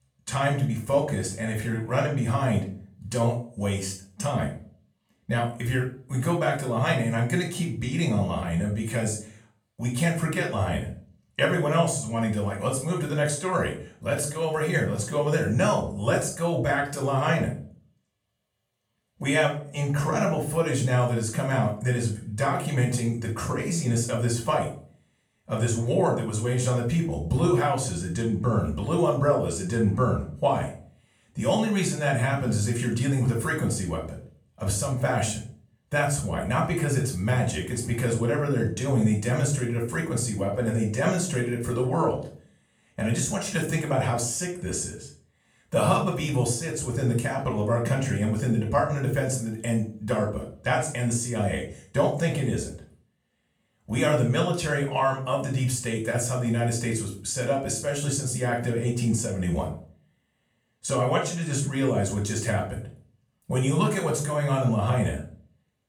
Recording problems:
off-mic speech; far
room echo; slight; dies away in 0.4 s

